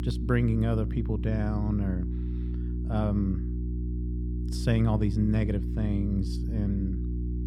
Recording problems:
electrical hum; loud; throughout; 60 Hz, 9 dB below the speech

